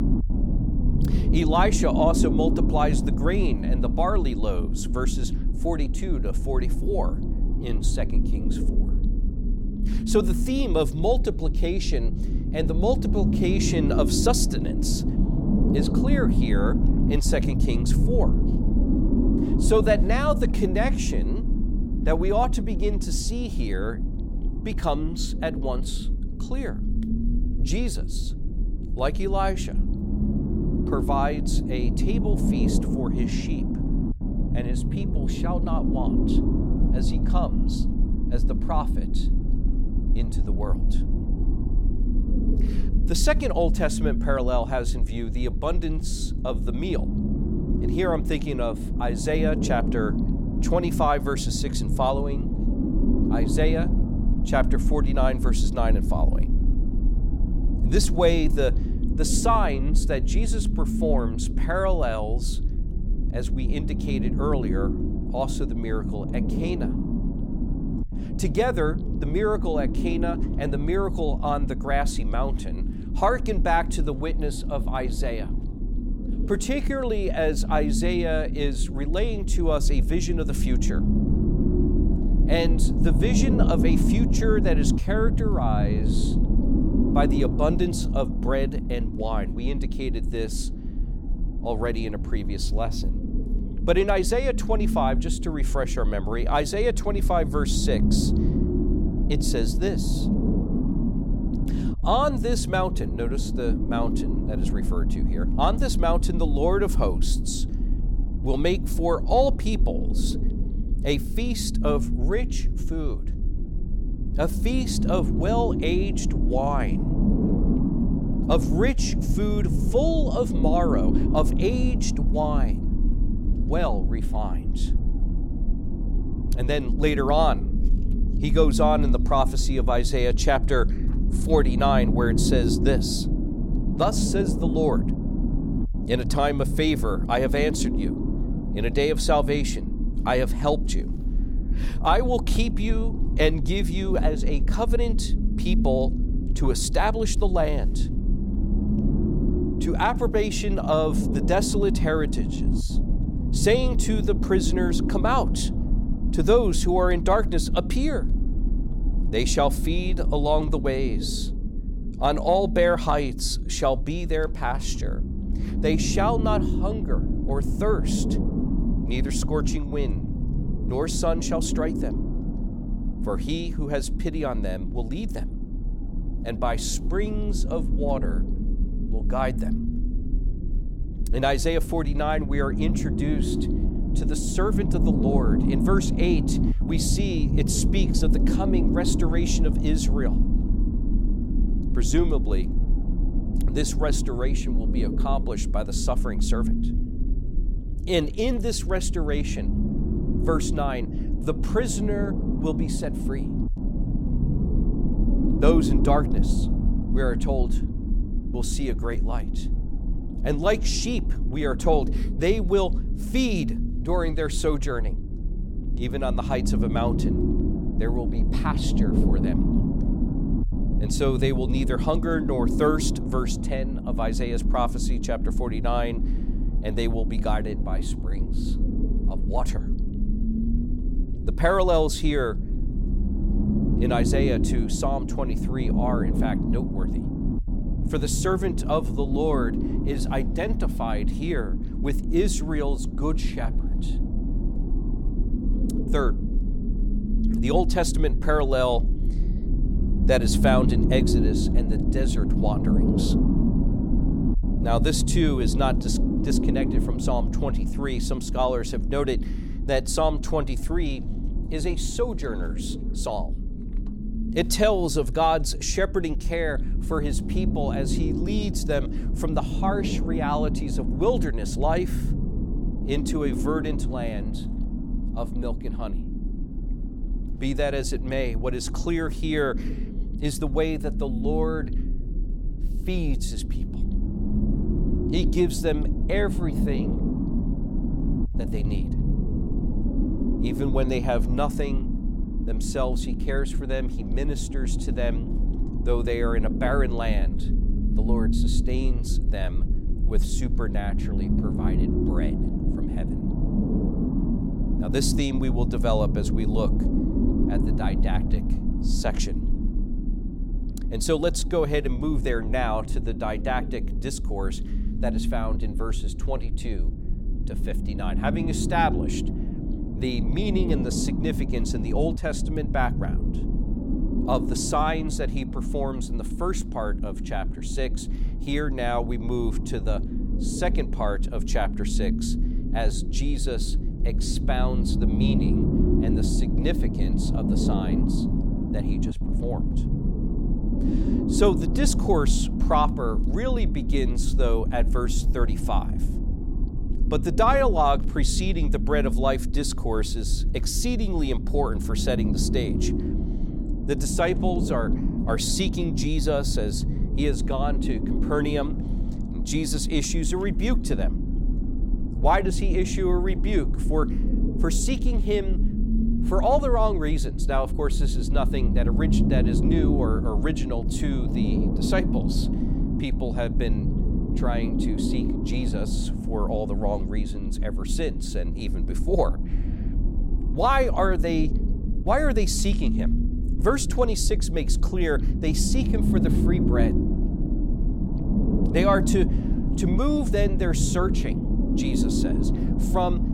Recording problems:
low rumble; loud; throughout; 8 dB below the speech

